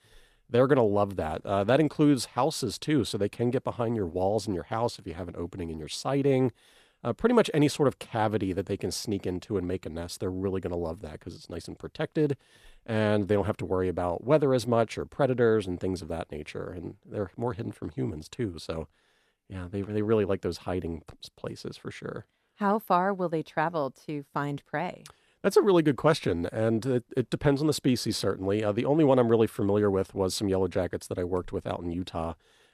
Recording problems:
none

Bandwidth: 14.5 kHz